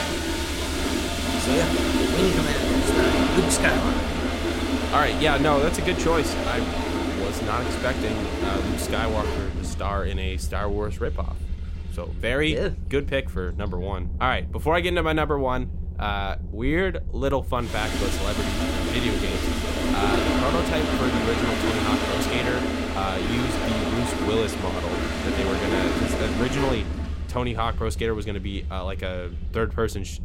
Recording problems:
household noises; very loud; throughout; 1 dB above the speech
low rumble; faint; throughout; 20 dB below the speech

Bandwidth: 16 kHz